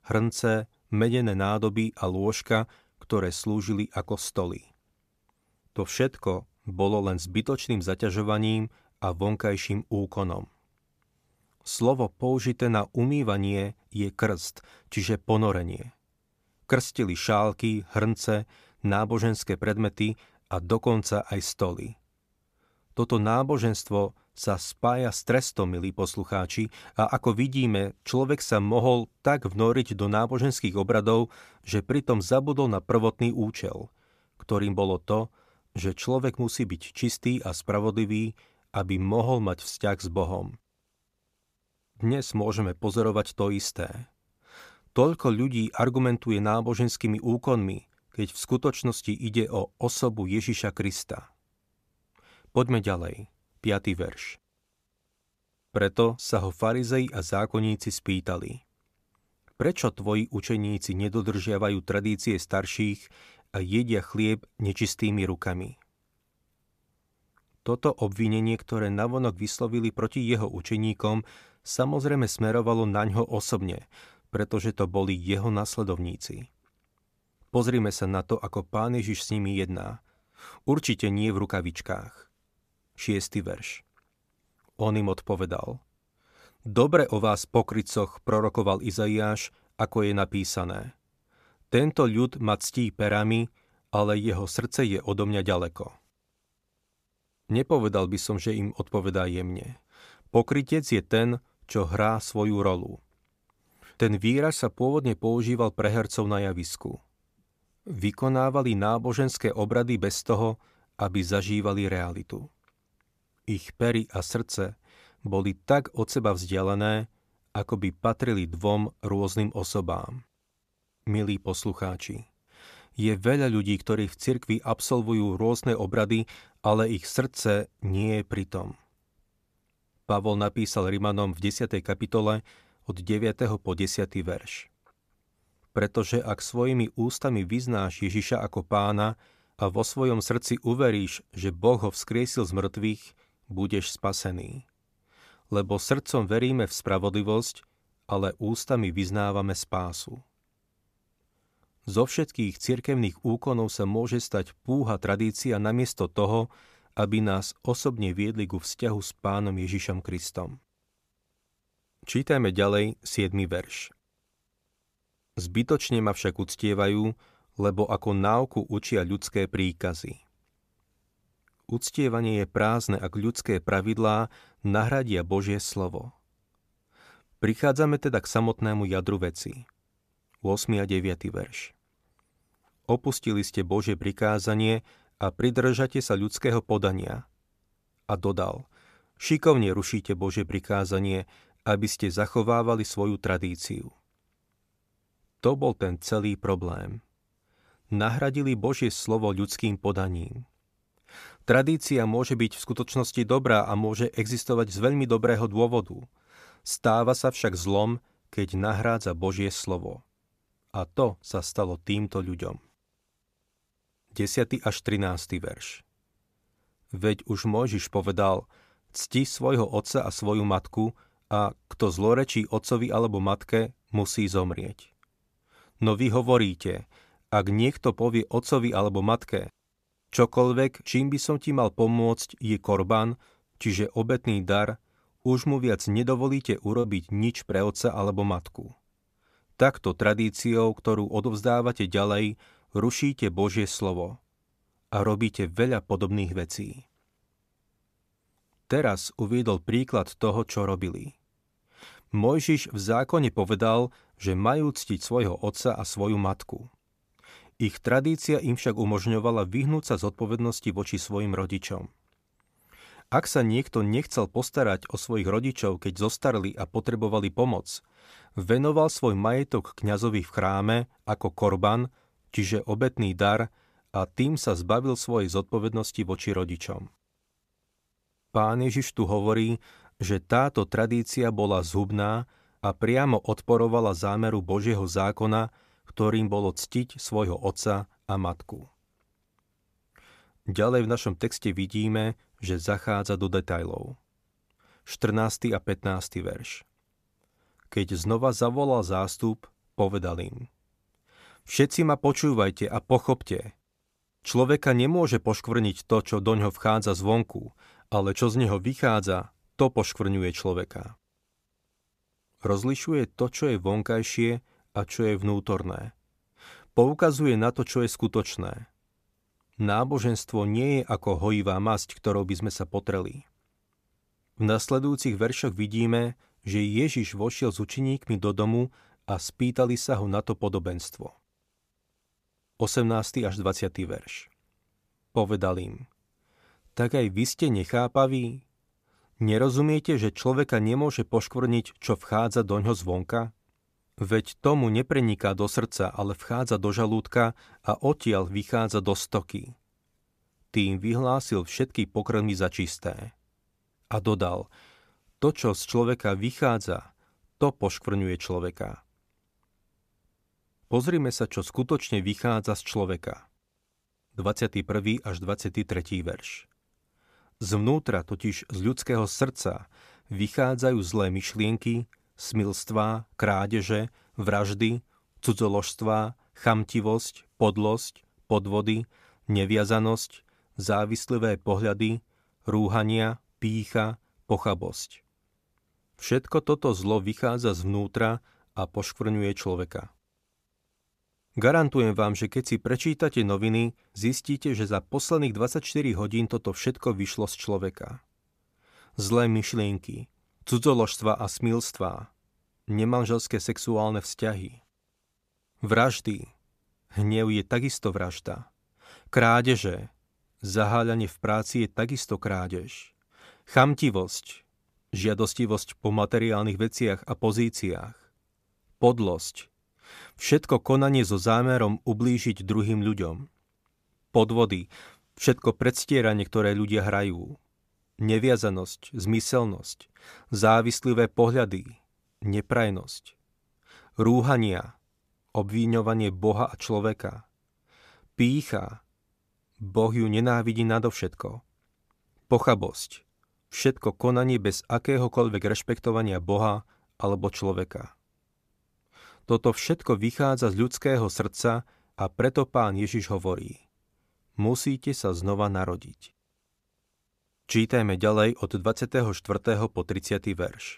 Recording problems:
choppy; occasionally; at 3:57; 3% of the speech affected

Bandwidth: 14.5 kHz